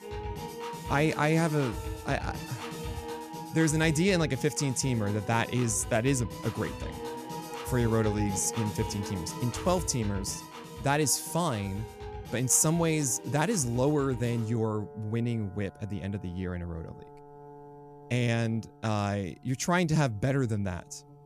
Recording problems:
background music; noticeable; throughout; 10 dB below the speech

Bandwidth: 14.5 kHz